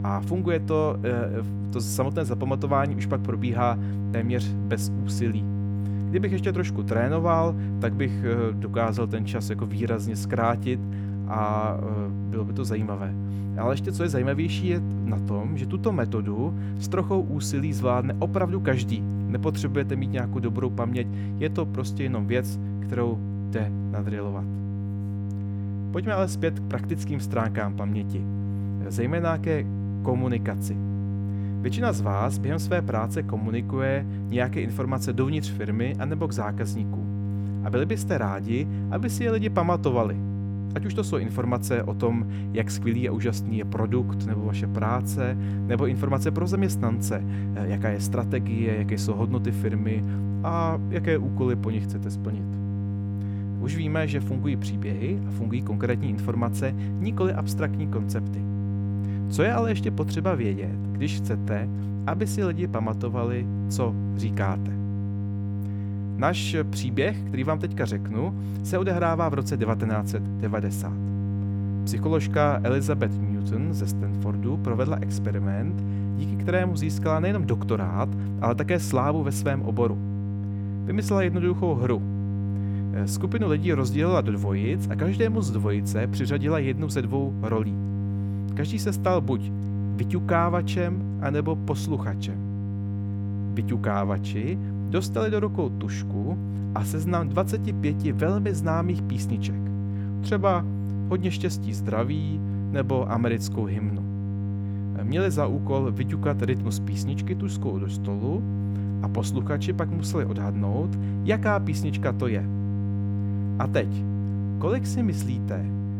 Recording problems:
electrical hum; loud; throughout; 50 Hz, 9 dB below the speech

